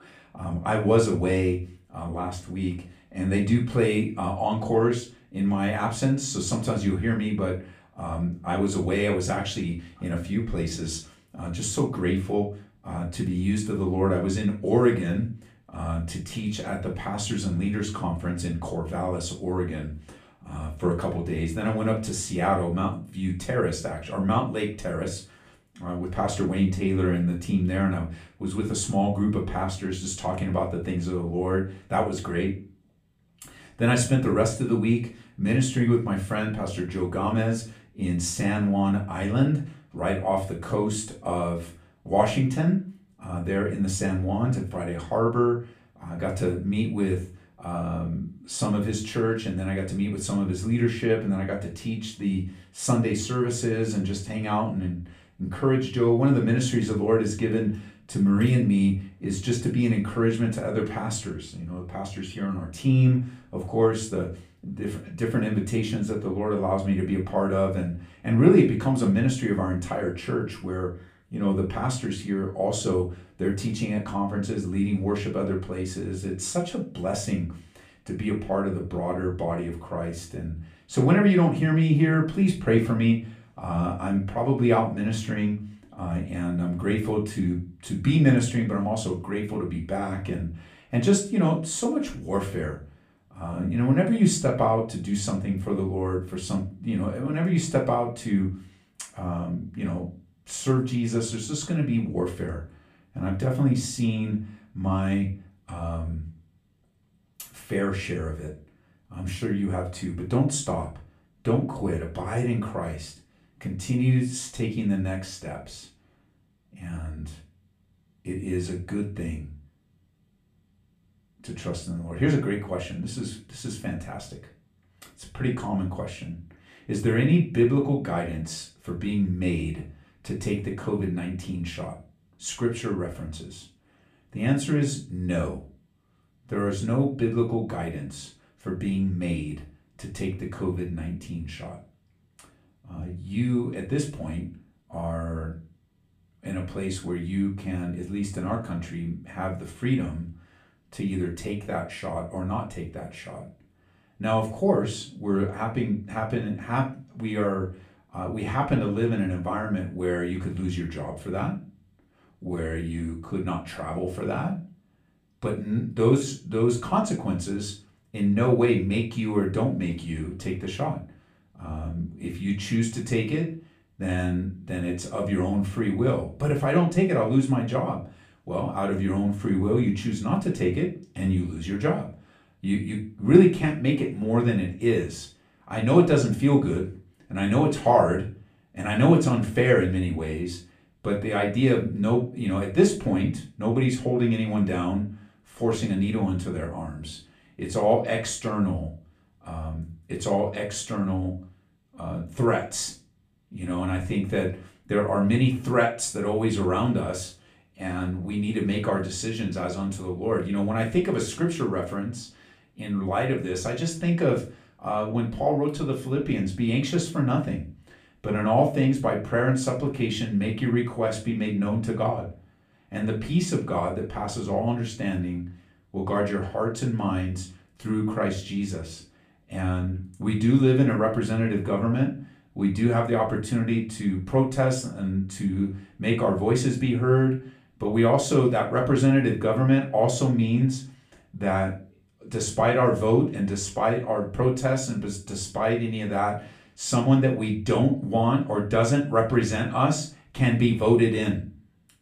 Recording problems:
off-mic speech; far
room echo; slight; dies away in 0.3 s

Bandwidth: 15 kHz